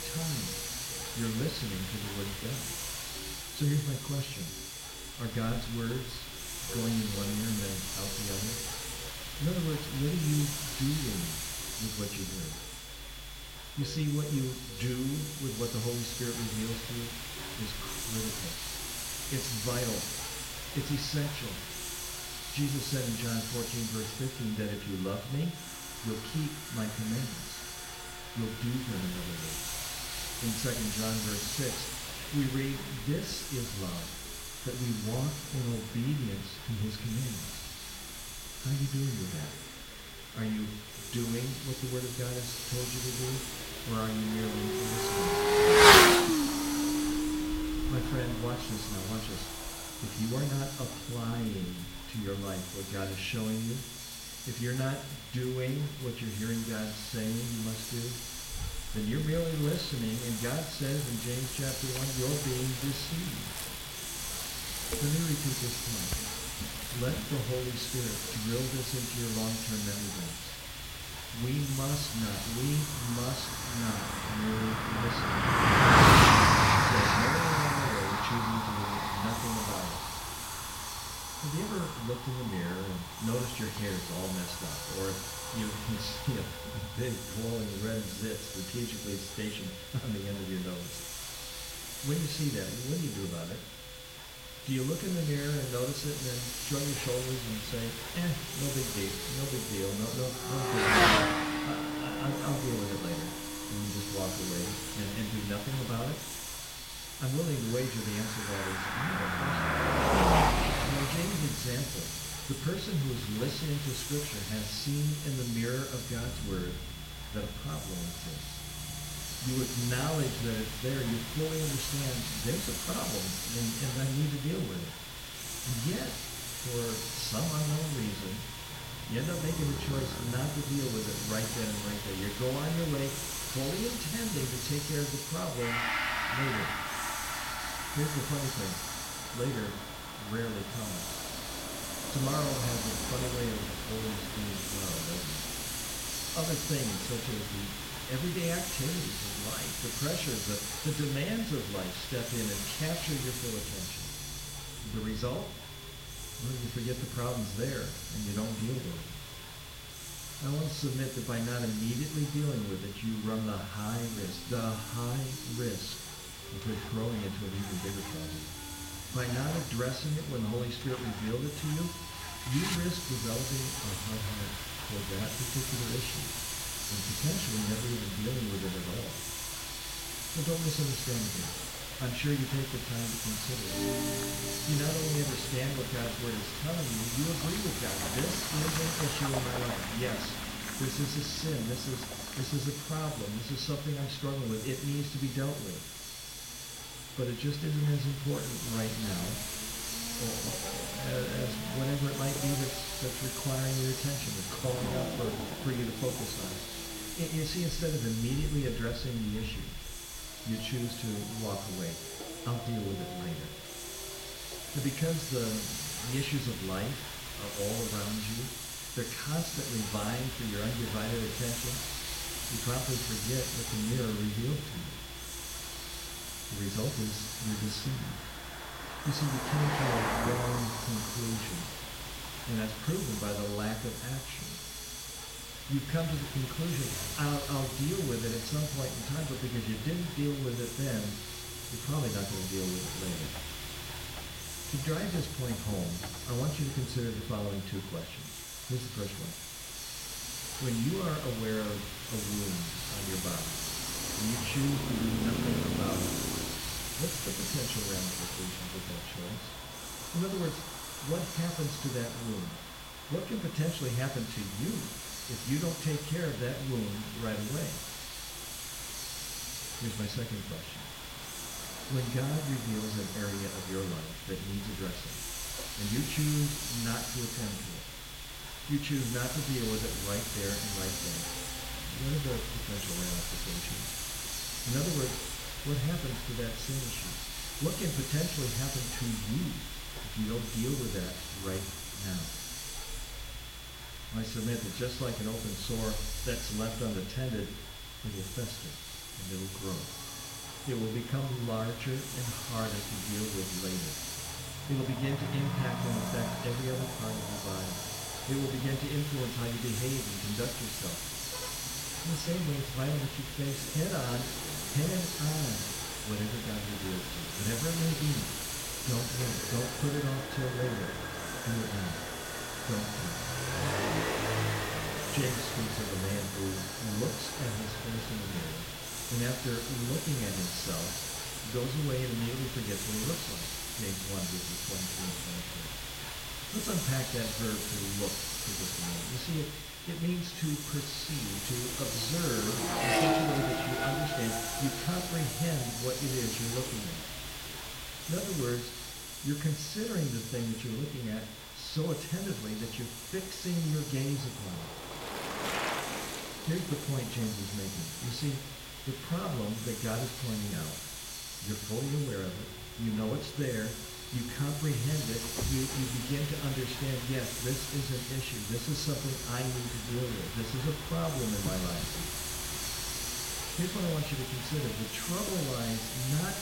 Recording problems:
room echo; slight; dies away in 0.7 s
off-mic speech; somewhat distant
traffic noise; very loud; throughout; 2 dB above the speech
hiss; loud; throughout; 2 dB below the speech
high-pitched whine; noticeable; throughout; 3.5 kHz, 15 dB below the speech
background music; noticeable; throughout; 15 dB below the speech

